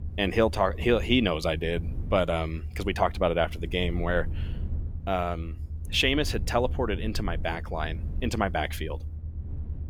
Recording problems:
low rumble; faint; throughout; 25 dB below the speech

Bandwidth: 18 kHz